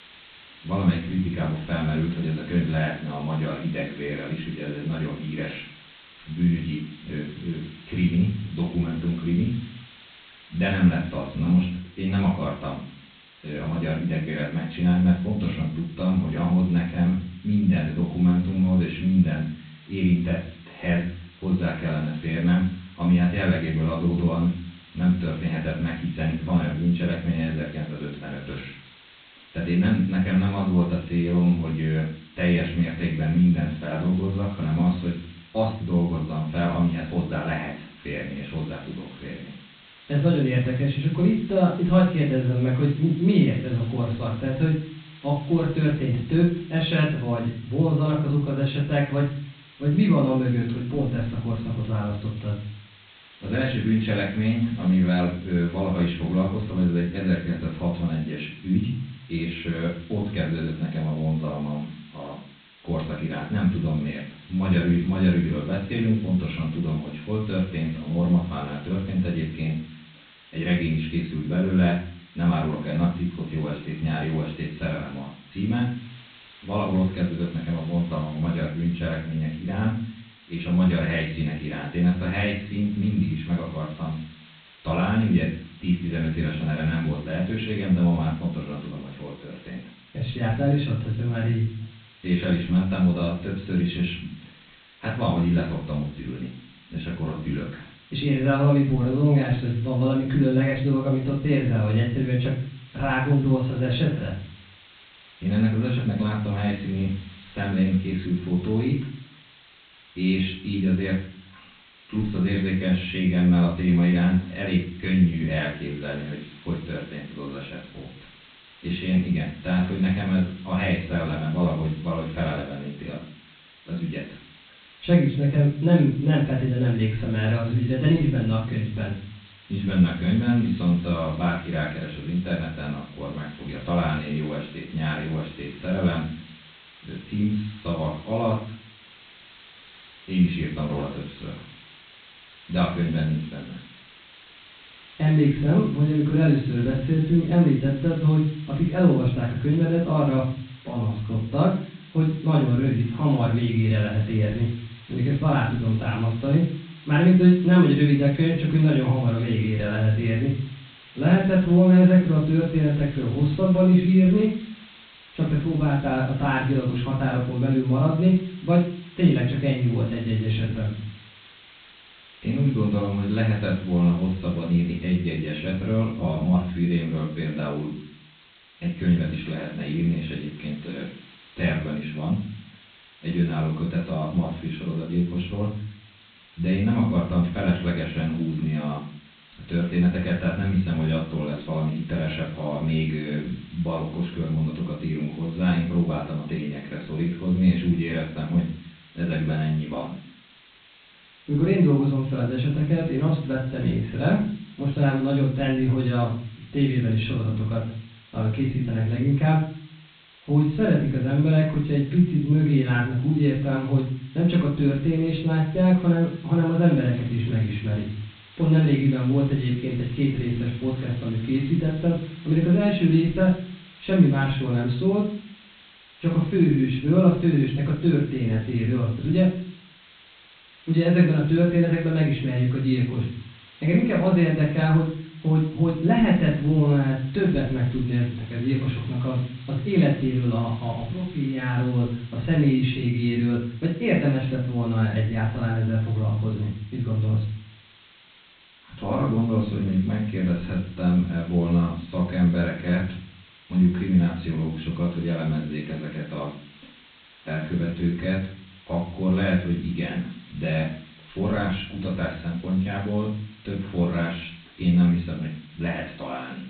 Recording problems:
off-mic speech; far
high frequencies cut off; severe; nothing above 4 kHz
room echo; noticeable; dies away in 0.5 s
hiss; faint; throughout; 25 dB below the speech

